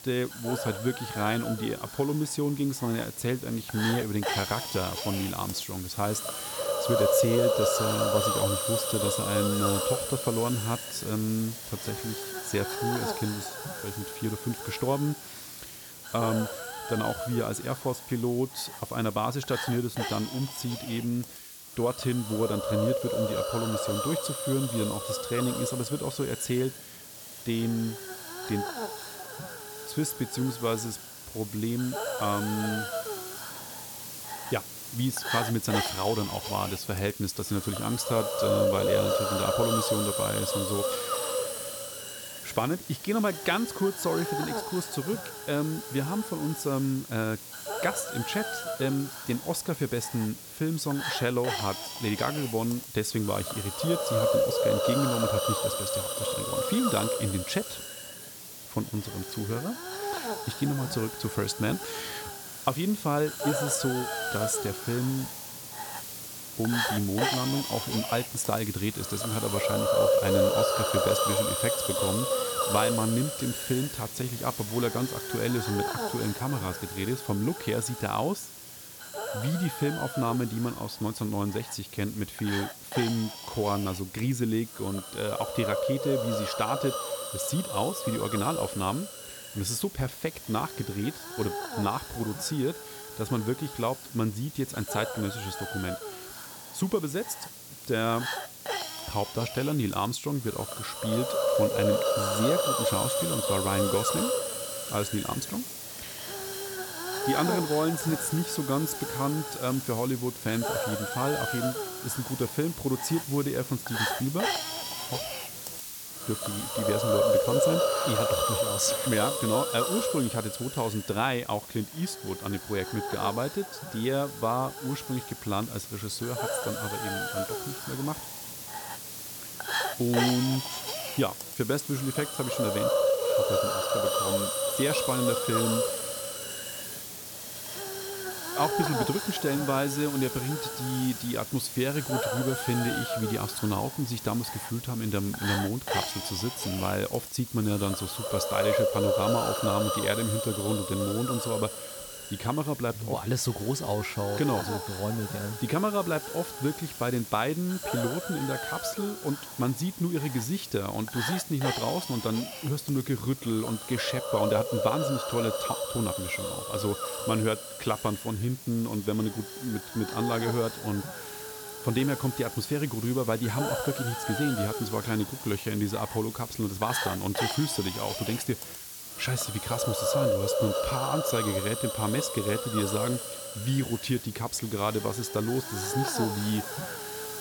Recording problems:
hiss; loud; throughout; 1 dB below the speech

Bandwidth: 18.5 kHz